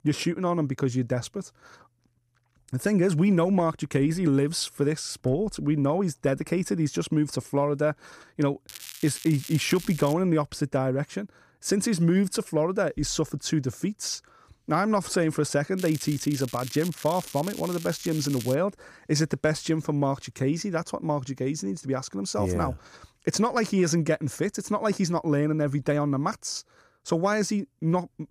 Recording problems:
crackling; noticeable; from 8.5 to 10 s and from 16 to 19 s; 15 dB below the speech

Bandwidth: 14.5 kHz